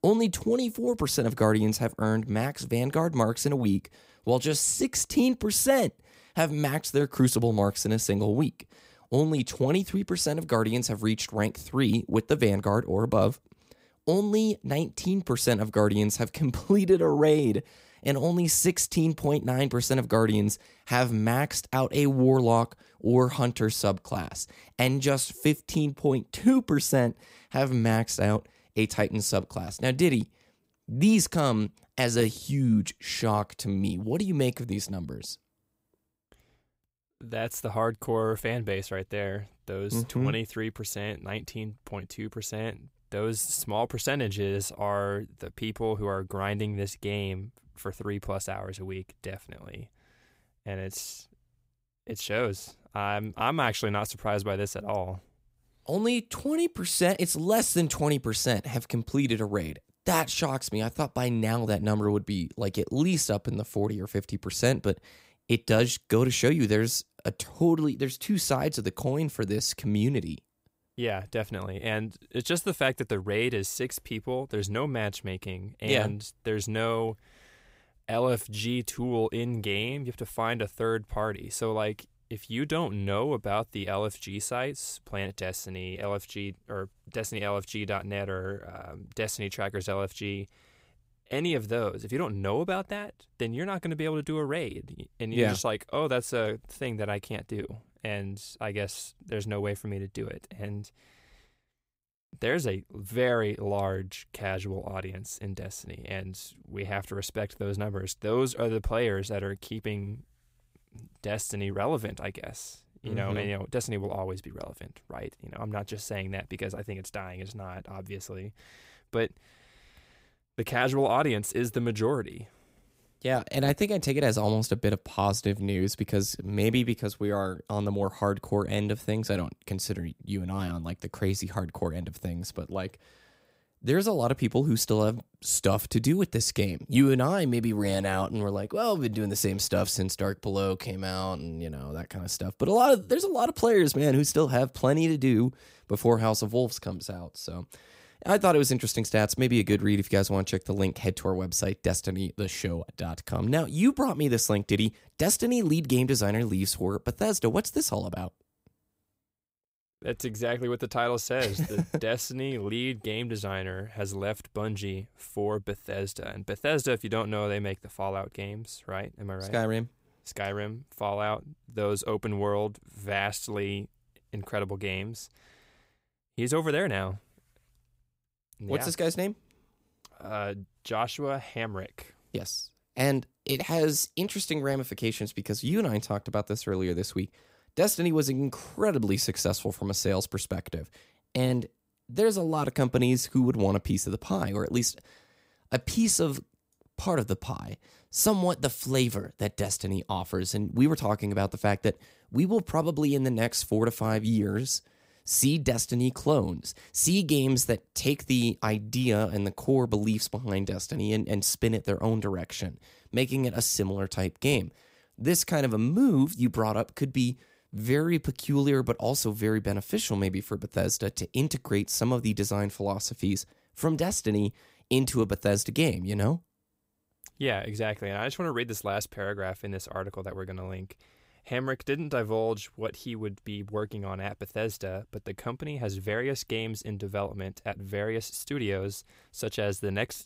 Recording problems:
none

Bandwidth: 15.5 kHz